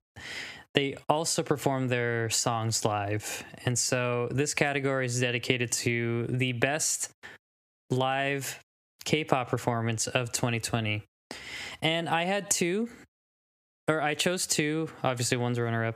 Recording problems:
squashed, flat; heavily

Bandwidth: 15 kHz